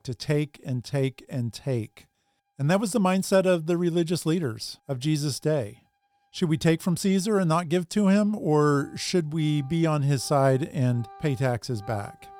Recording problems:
background music; faint; throughout; 25 dB below the speech

